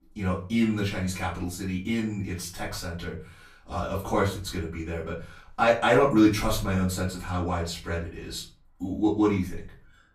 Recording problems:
off-mic speech; far
room echo; slight; dies away in 0.4 s

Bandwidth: 15 kHz